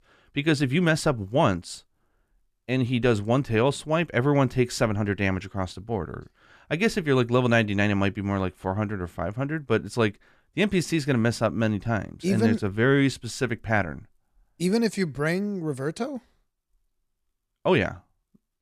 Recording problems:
none

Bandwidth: 14 kHz